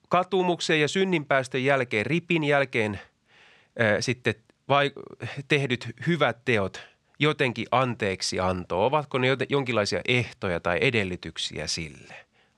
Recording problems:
none

